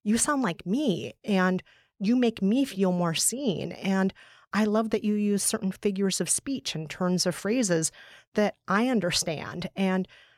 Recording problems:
none

